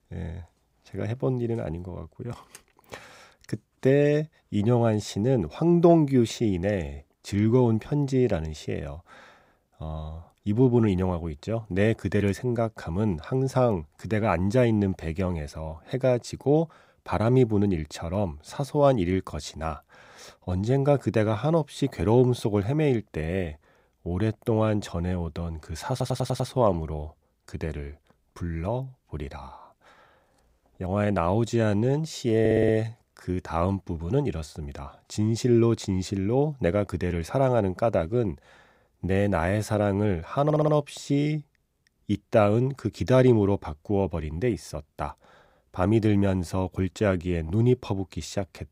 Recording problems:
audio stuttering; at 26 s, at 32 s and at 40 s

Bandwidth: 15.5 kHz